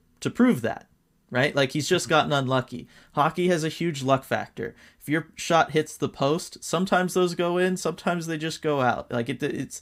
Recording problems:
none

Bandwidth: 15.5 kHz